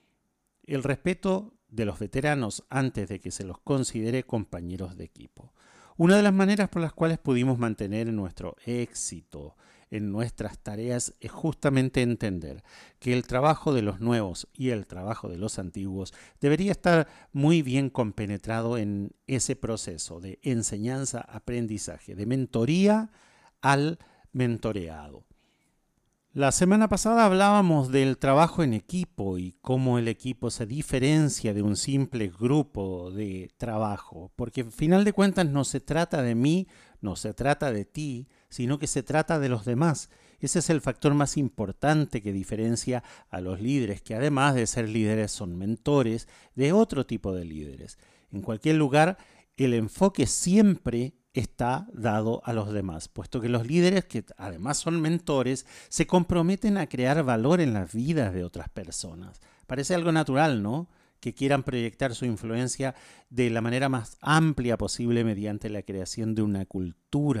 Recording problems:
abrupt cut into speech; at the end

